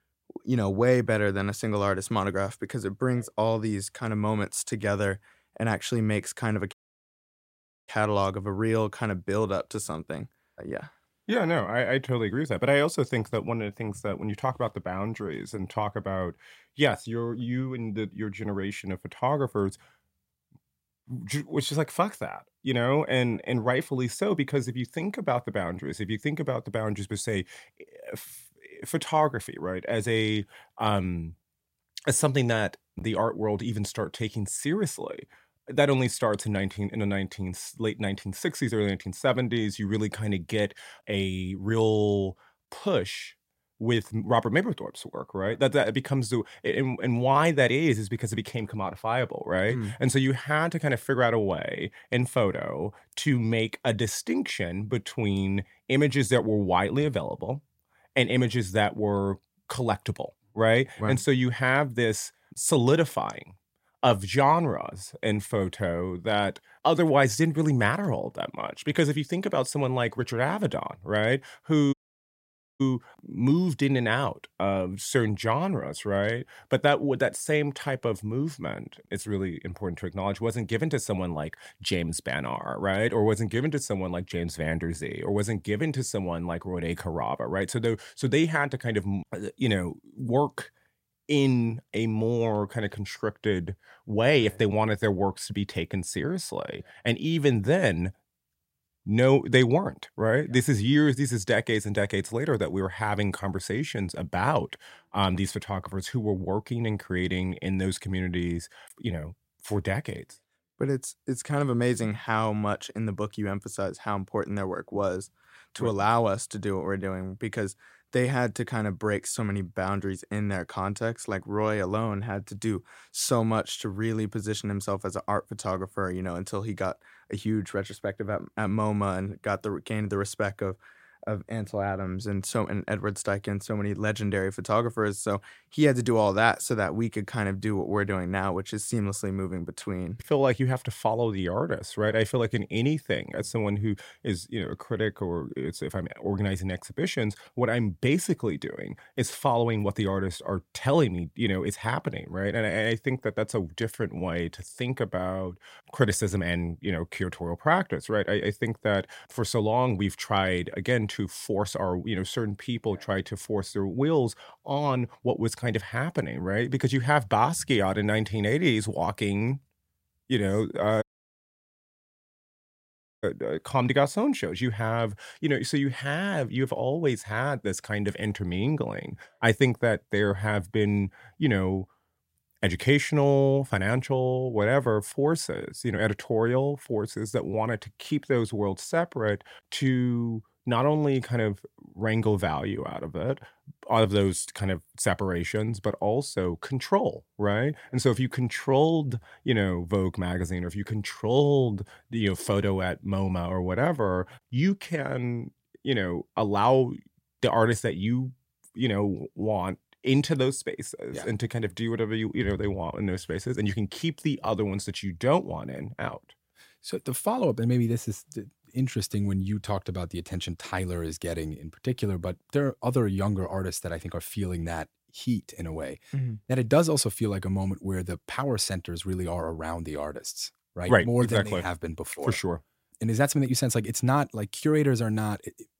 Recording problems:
audio cutting out; at 6.5 s for 1 s, at 1:12 for 1 s and at 2:51 for 2 s

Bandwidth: 16 kHz